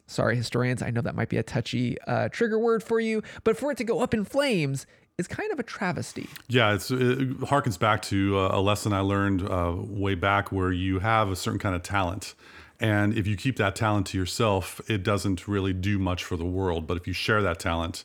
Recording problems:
none

